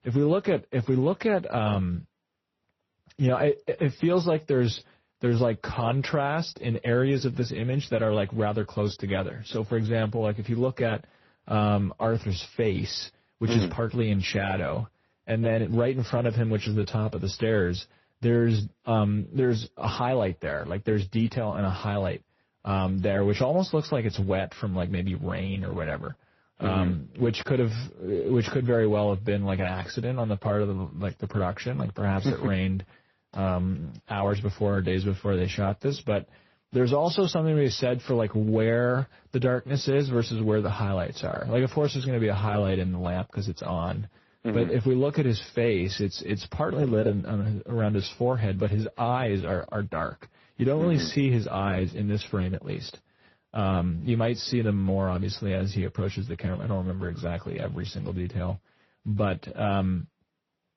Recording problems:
garbled, watery; slightly; nothing above 6 kHz

